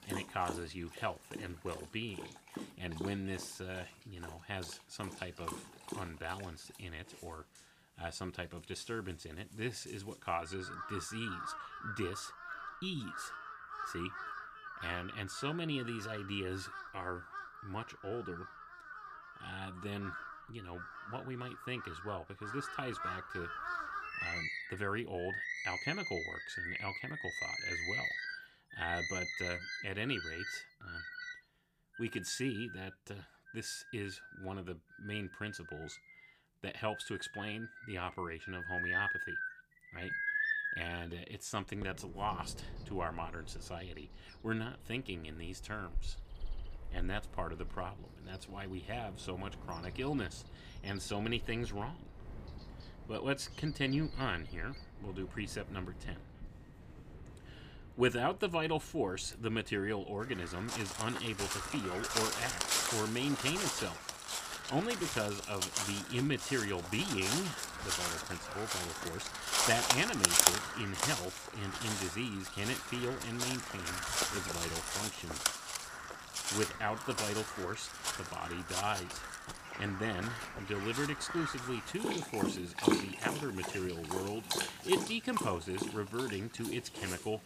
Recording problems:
animal sounds; very loud; throughout; 2 dB above the speech

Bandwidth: 15 kHz